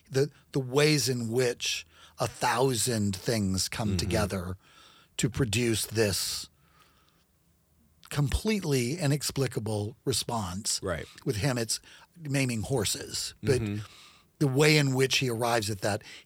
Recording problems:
none

